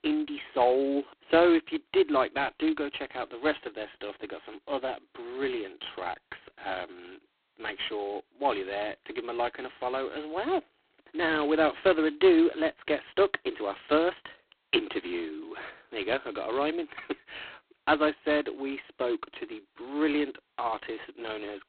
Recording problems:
phone-call audio; poor line; nothing above 4 kHz

